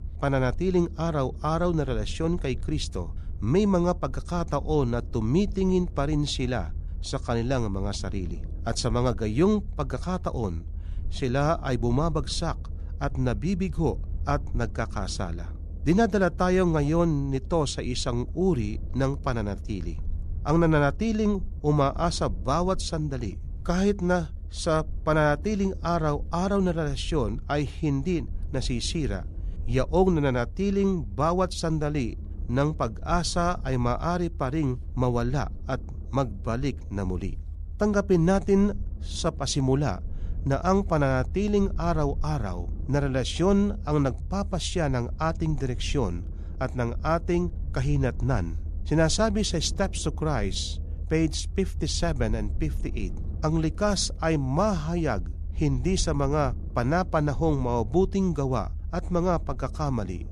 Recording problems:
low rumble; faint; throughout; 25 dB below the speech

